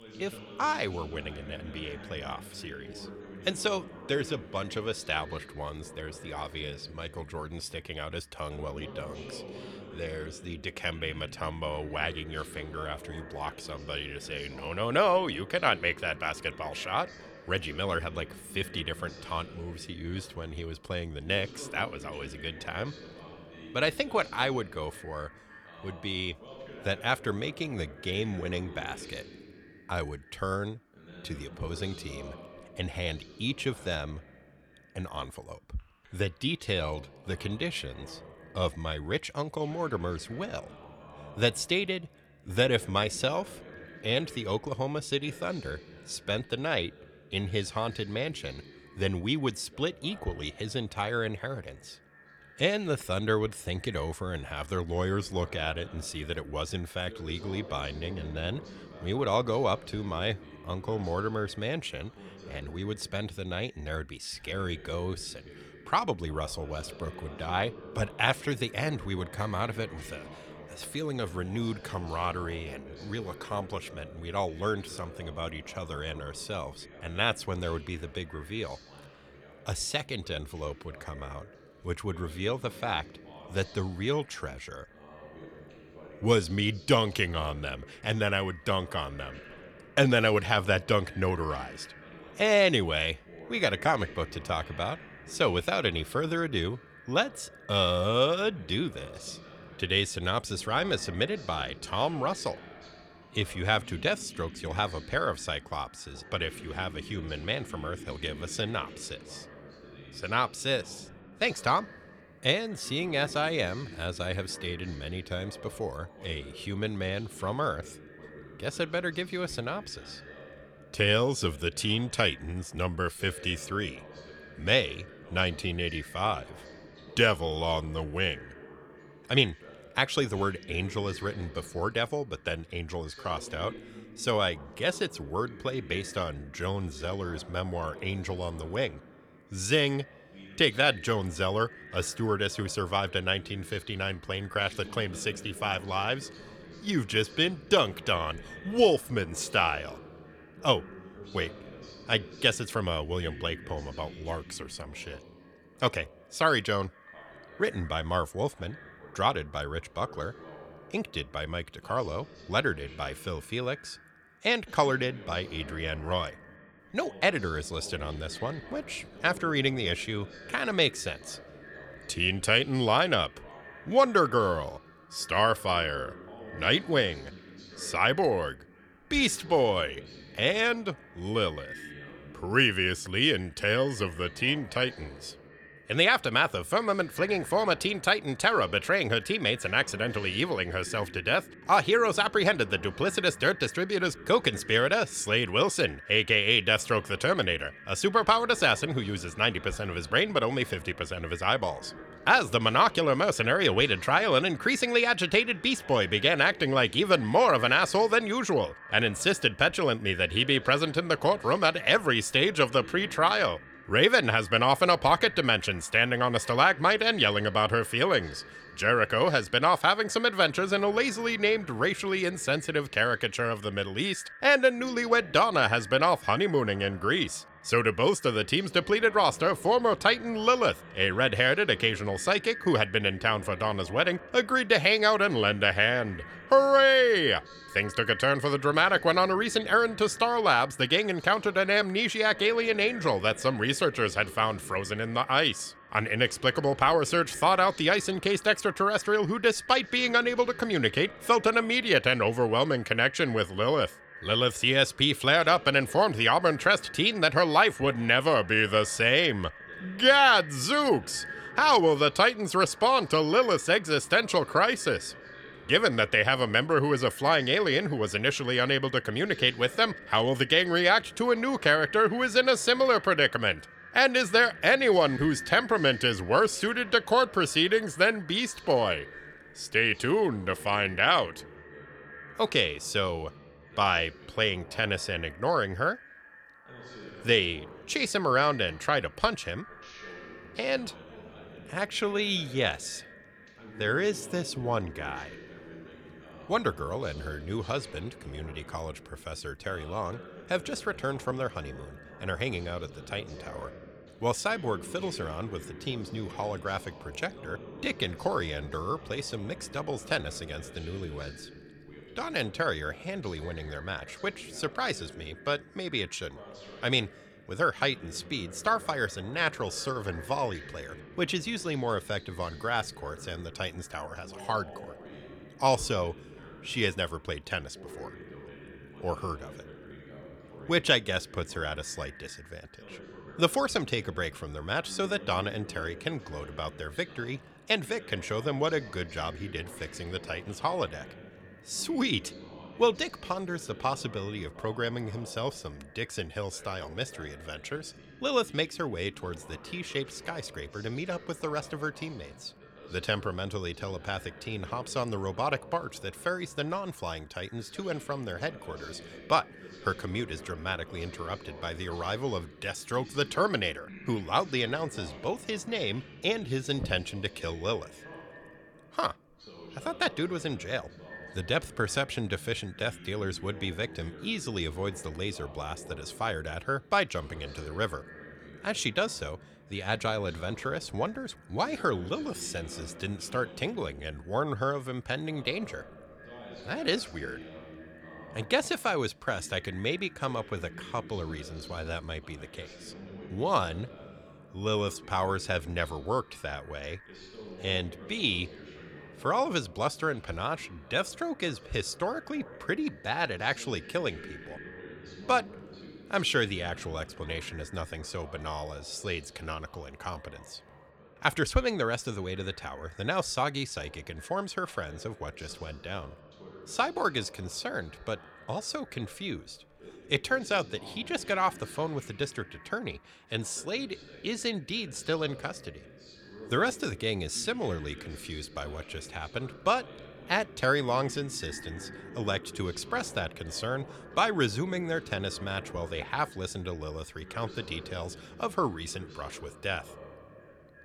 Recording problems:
echo of what is said; faint; throughout; 350 ms later, 20 dB below the speech
voice in the background; faint; throughout; 20 dB below the speech

